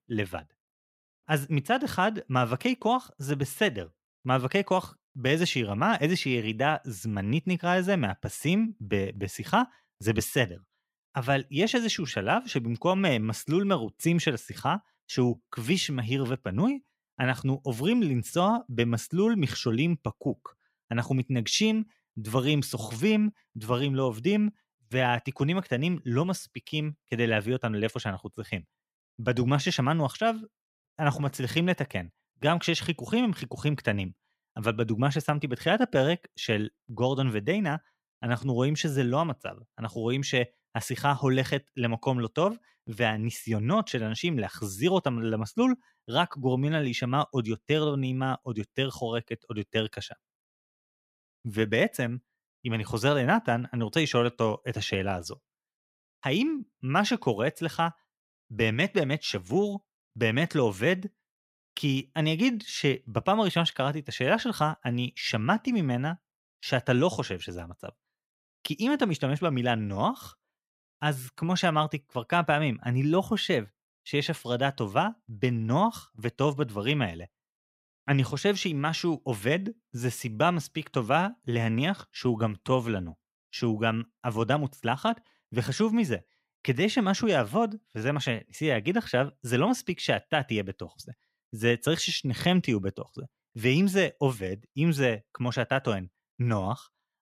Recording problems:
none

